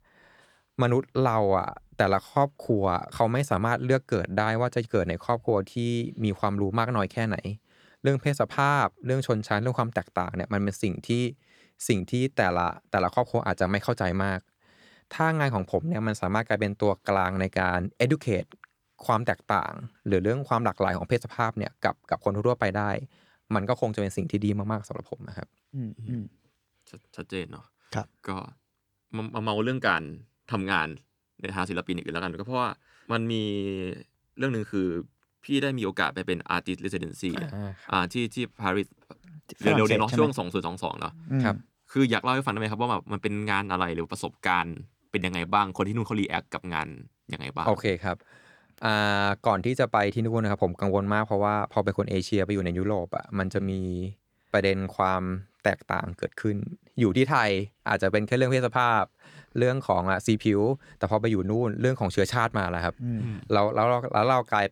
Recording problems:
none

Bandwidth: 18.5 kHz